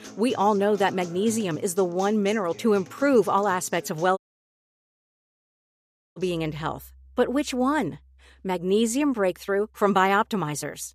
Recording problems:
background music; faint; throughout; 20 dB below the speech
audio cutting out; at 4 s for 2 s

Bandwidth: 14.5 kHz